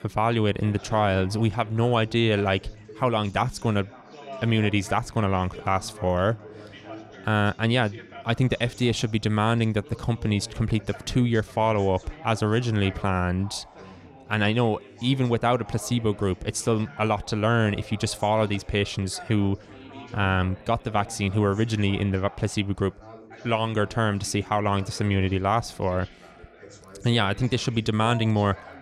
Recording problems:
background chatter; noticeable; throughout; 3 voices, 20 dB below the speech

